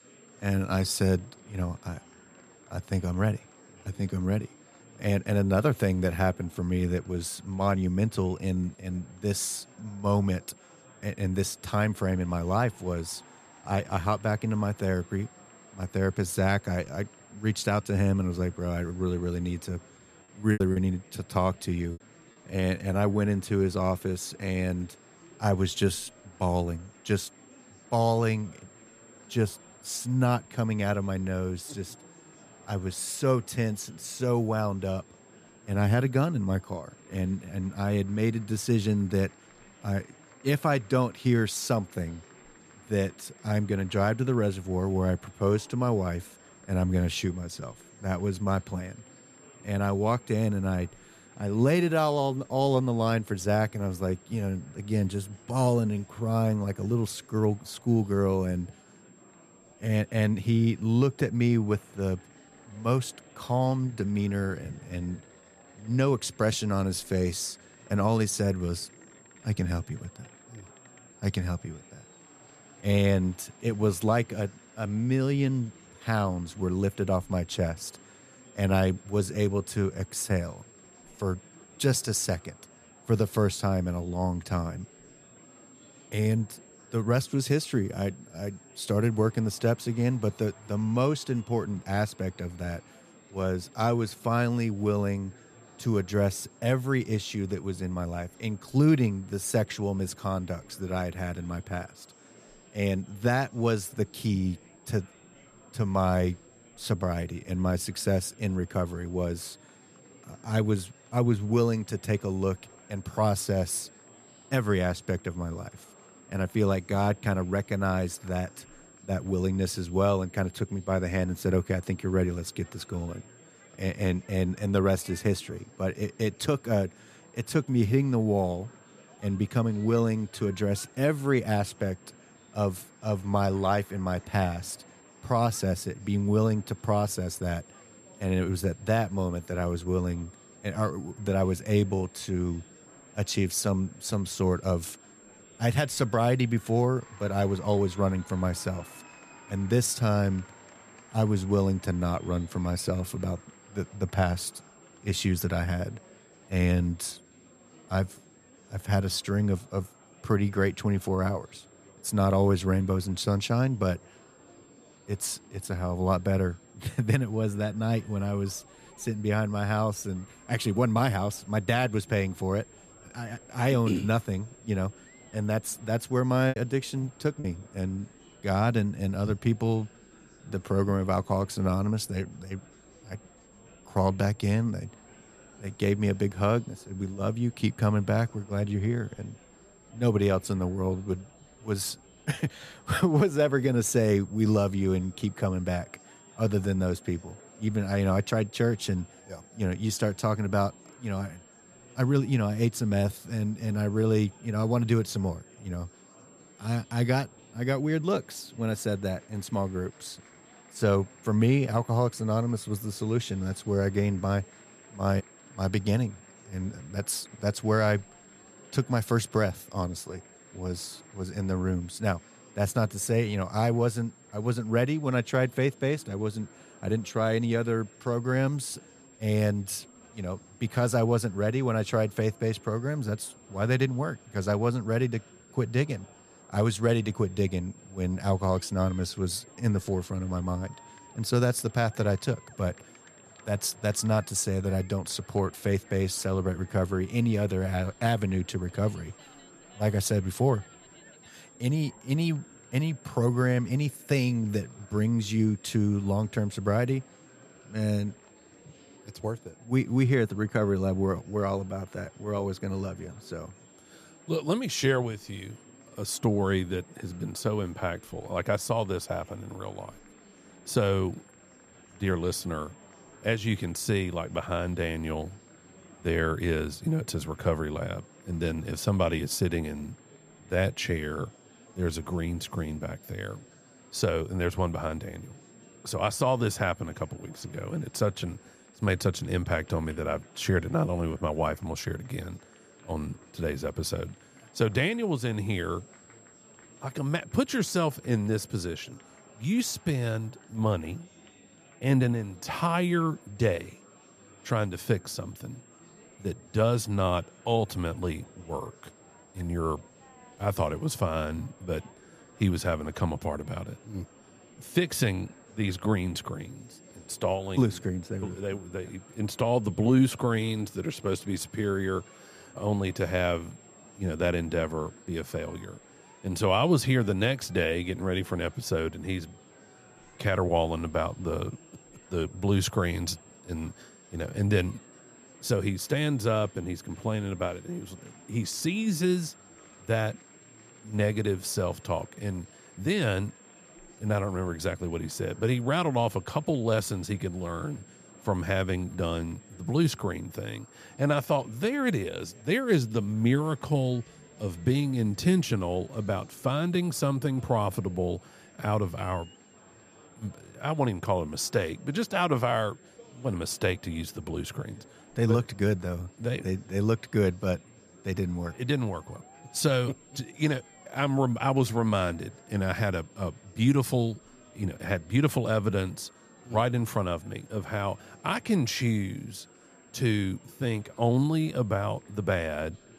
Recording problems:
high-pitched whine; faint; throughout; 7.5 kHz, 30 dB below the speech
murmuring crowd; faint; throughout; 25 dB below the speech
choppy; very; from 21 to 22 s and at 2:56; 8% of the speech affected

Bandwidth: 15 kHz